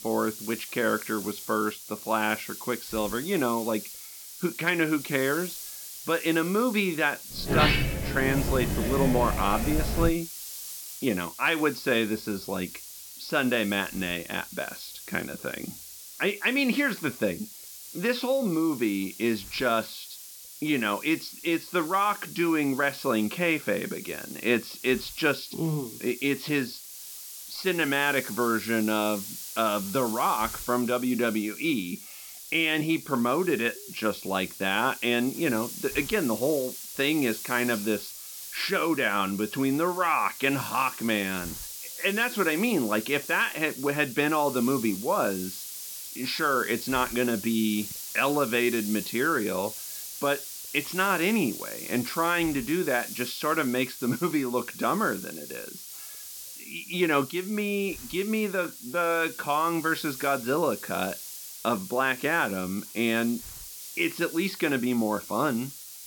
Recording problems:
high frequencies cut off; noticeable; nothing above 5.5 kHz
hiss; noticeable; throughout; 10 dB below the speech
door banging; loud; from 7.5 to 10 s; peak 5 dB above the speech

